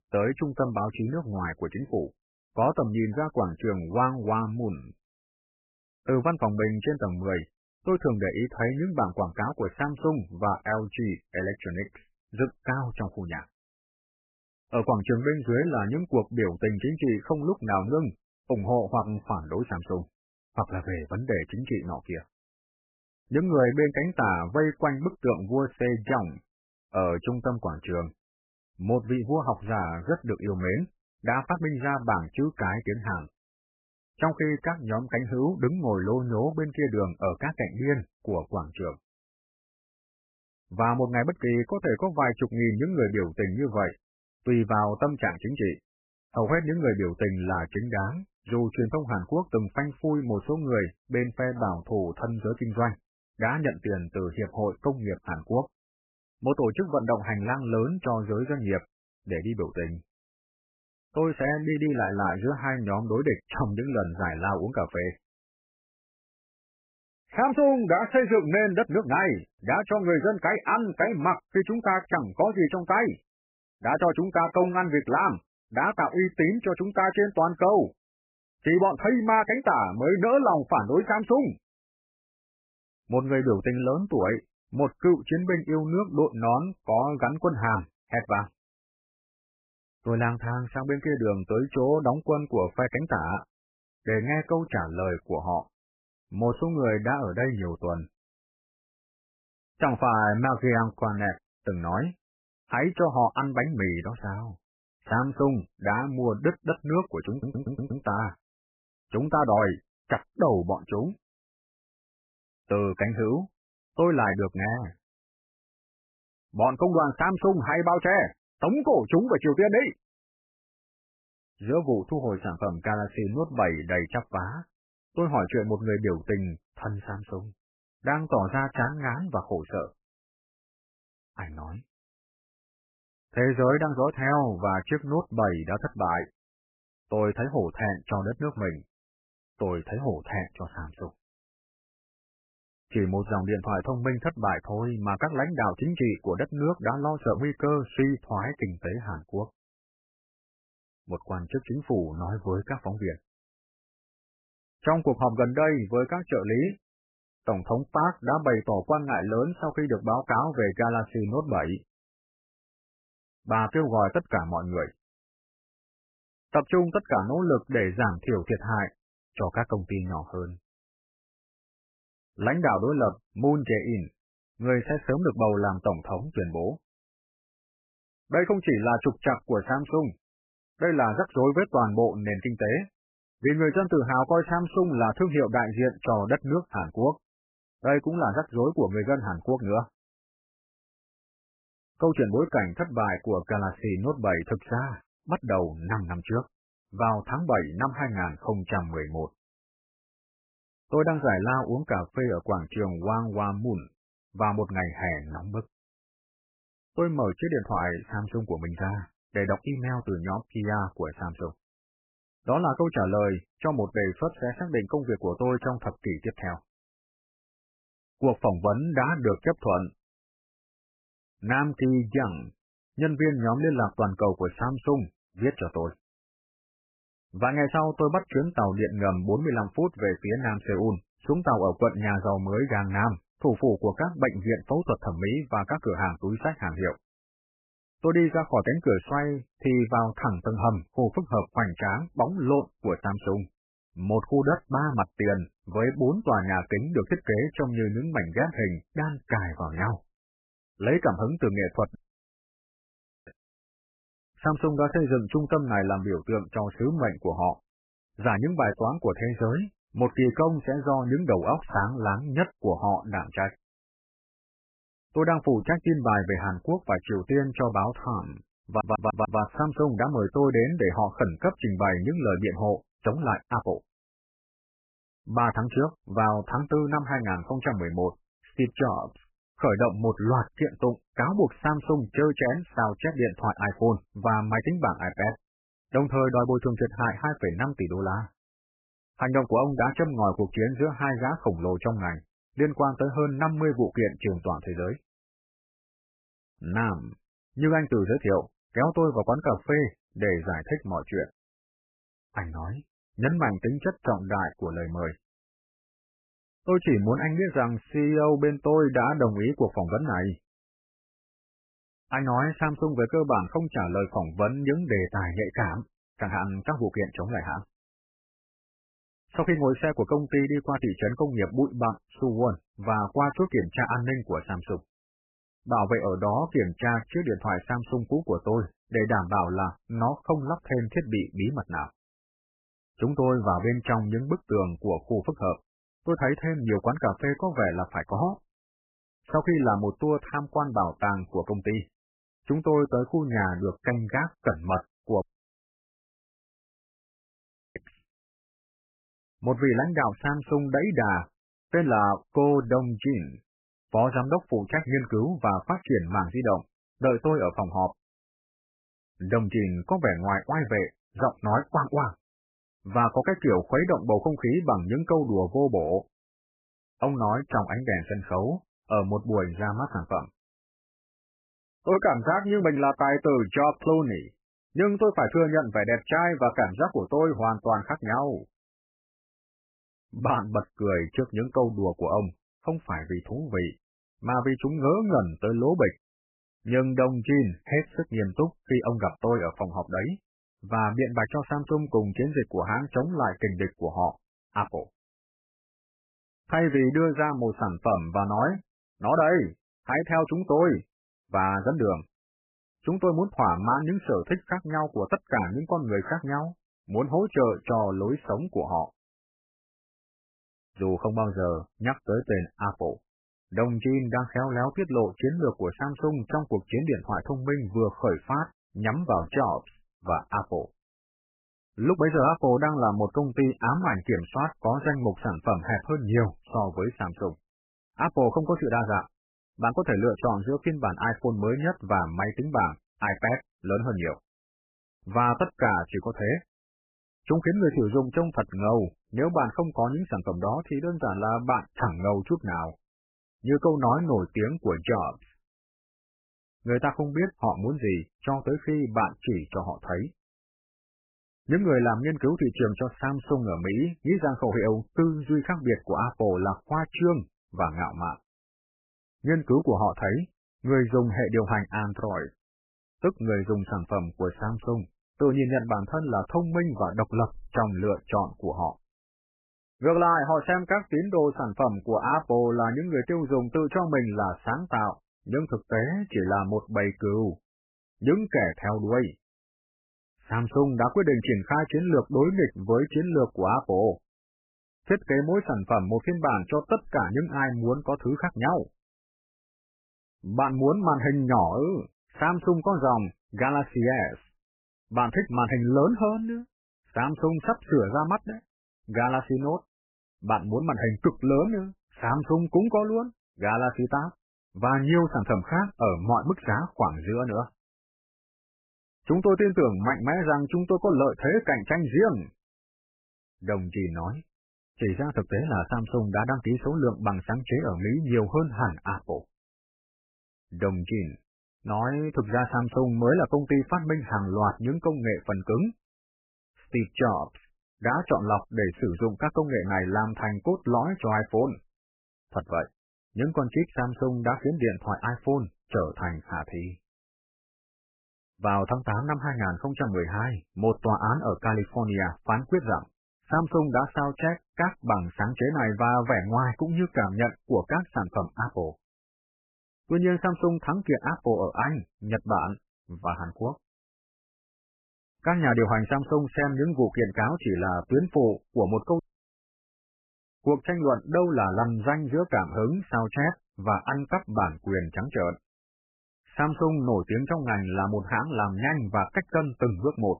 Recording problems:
garbled, watery; badly; nothing above 3 kHz
audio stuttering; at 1:47 and at 4:29
uneven, jittery; strongly; from 2:27 to 6:42
audio cutting out; at 4:12 for 1.5 s, at 5:45 for 2.5 s and at 9:19 for 1 s

